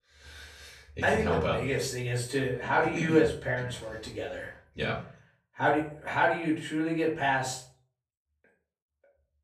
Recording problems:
off-mic speech; far
room echo; slight; dies away in 0.4 s

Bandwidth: 14.5 kHz